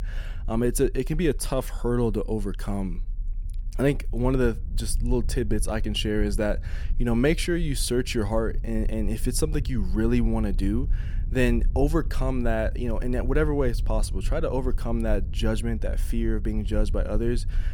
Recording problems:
low rumble; faint; throughout; 20 dB below the speech

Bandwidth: 18 kHz